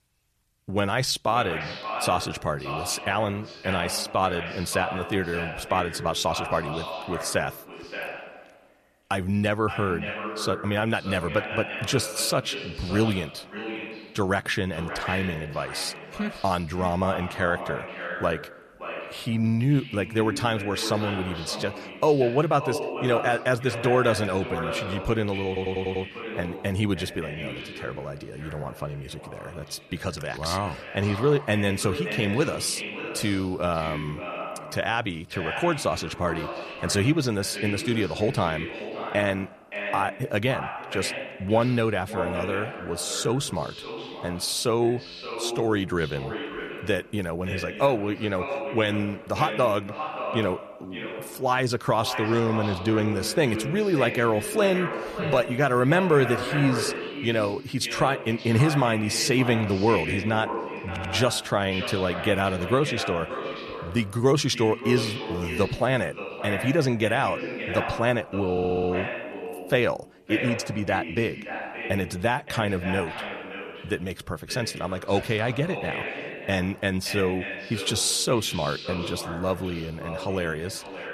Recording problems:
echo of what is said; strong; throughout; 570 ms later, 8 dB below the speech
audio stuttering; at 25 s, at 1:01 and at 1:09

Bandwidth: 14 kHz